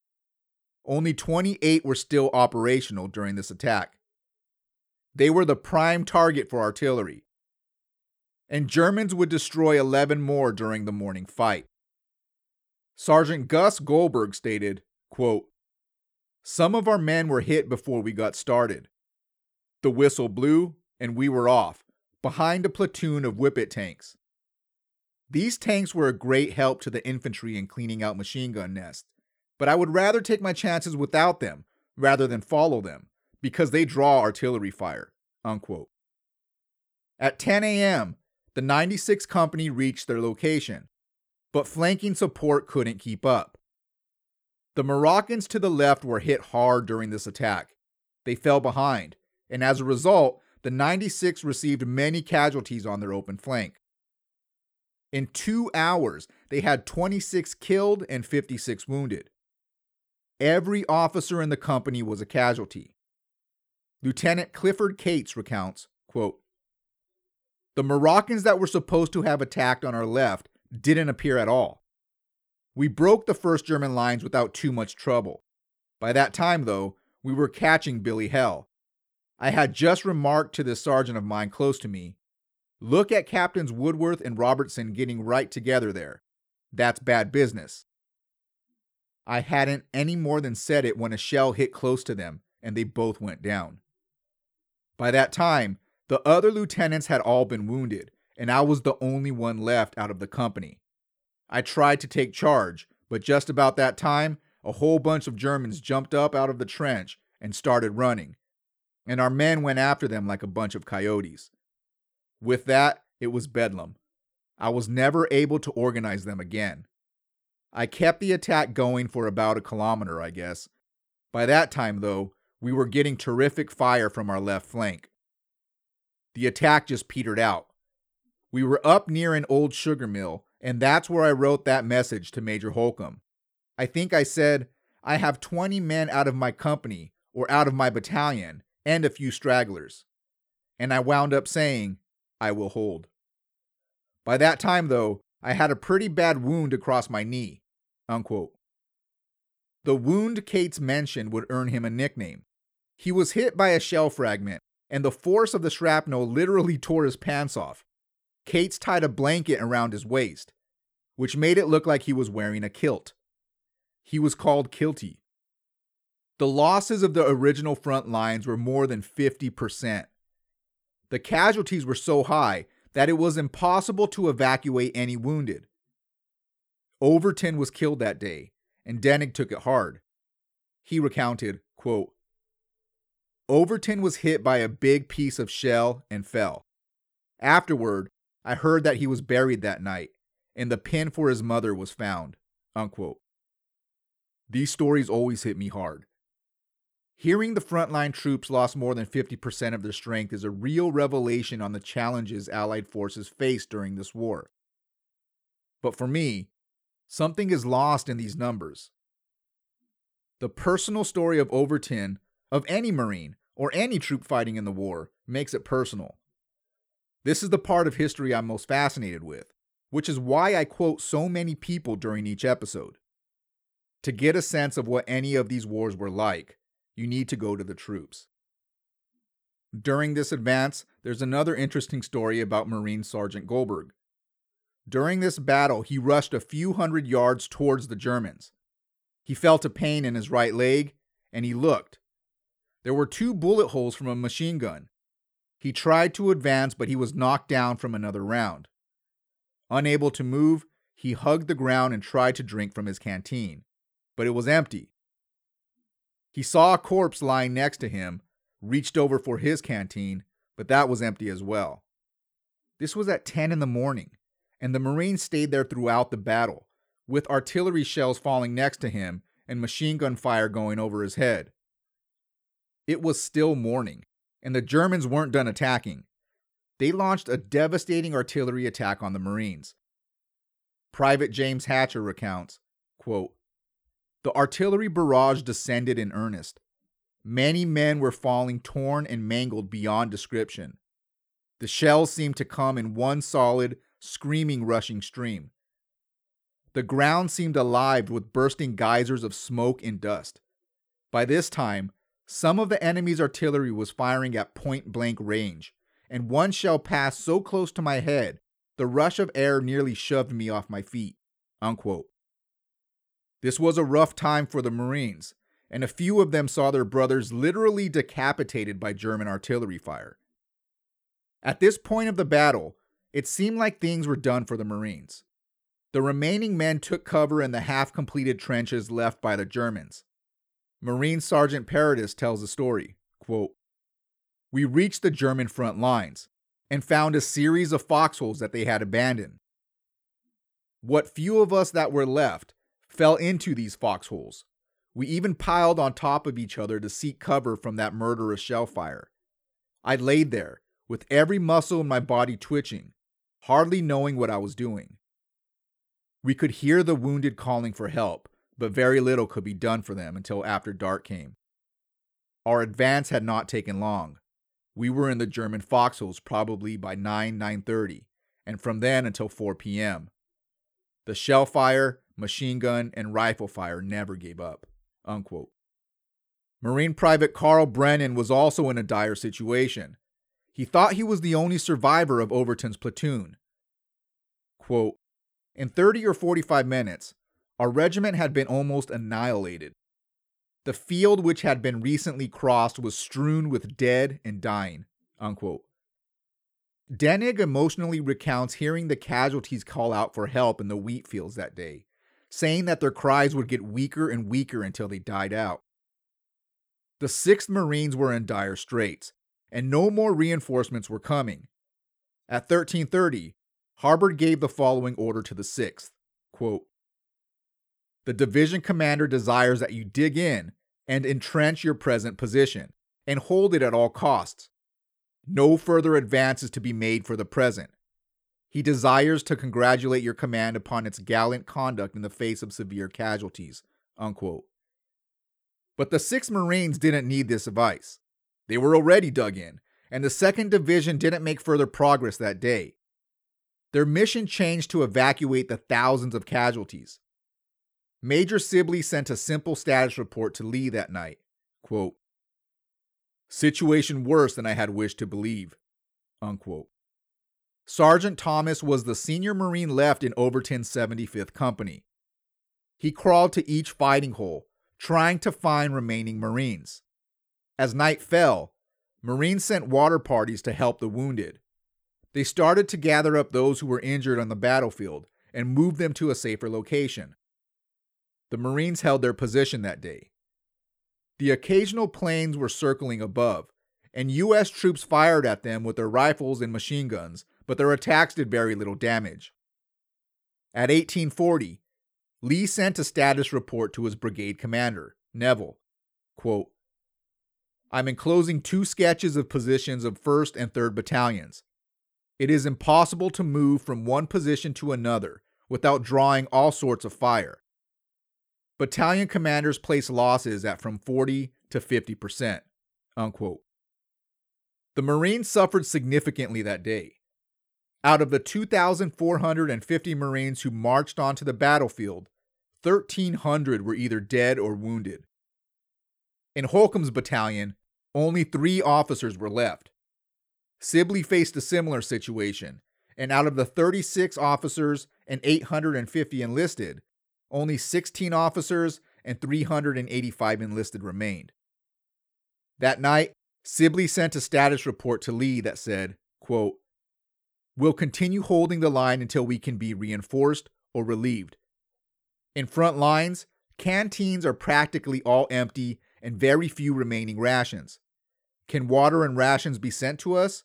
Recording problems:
none

